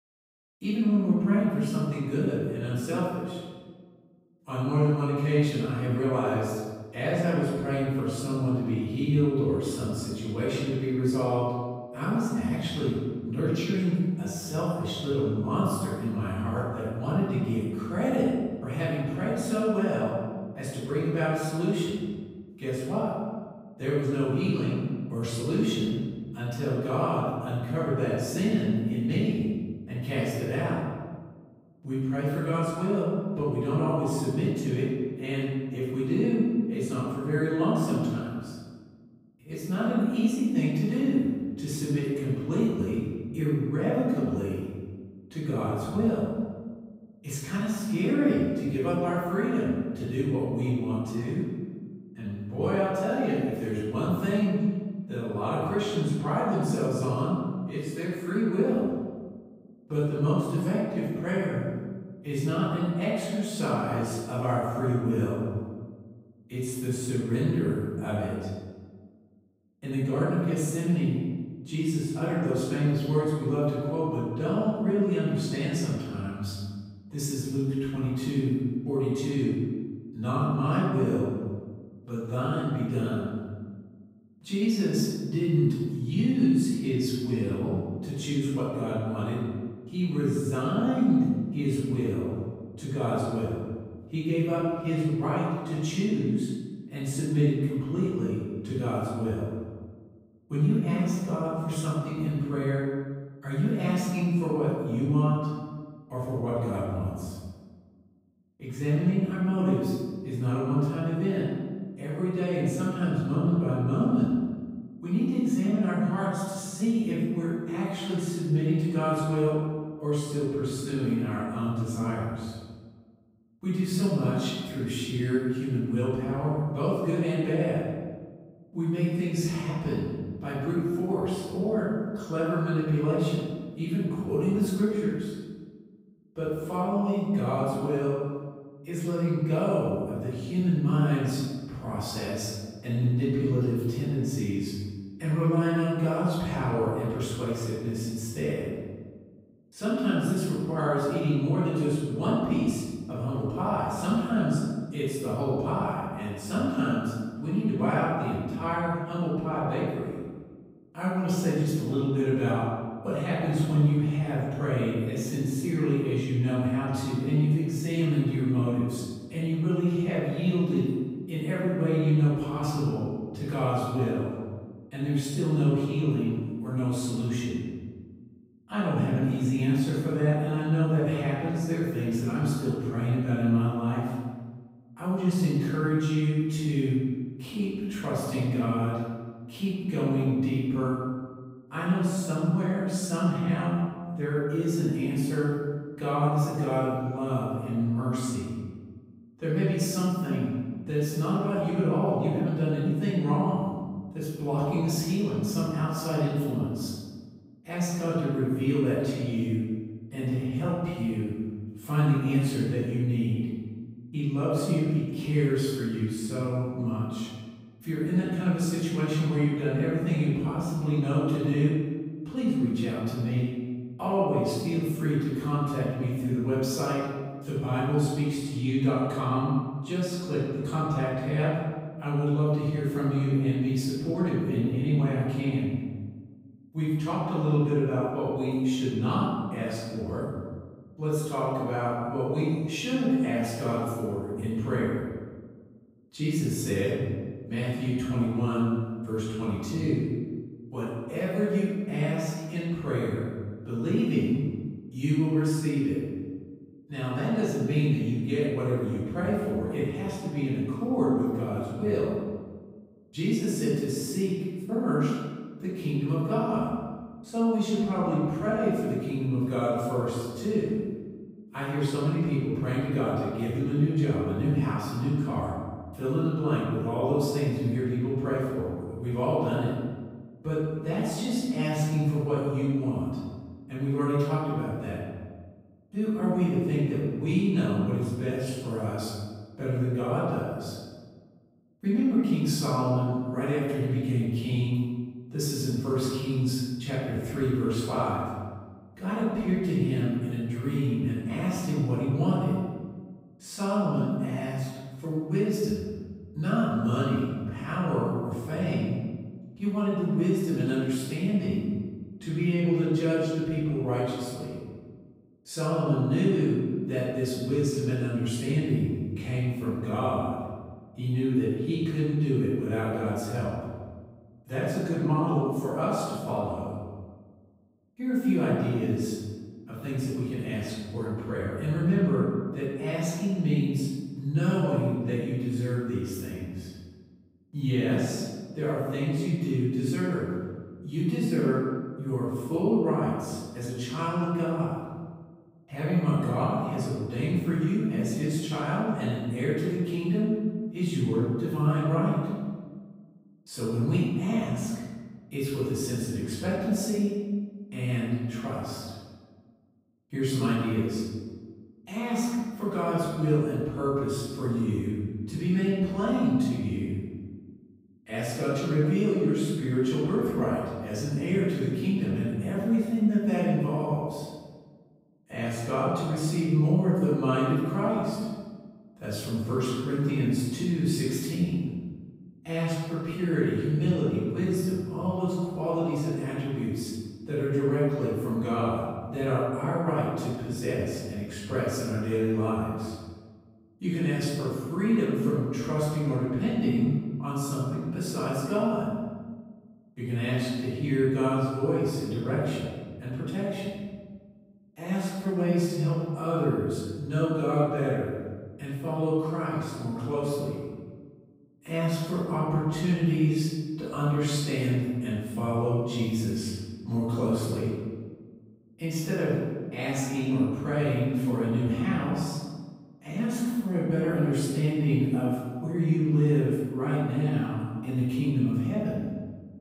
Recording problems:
room echo; strong; dies away in 1.4 s
off-mic speech; far

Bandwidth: 15.5 kHz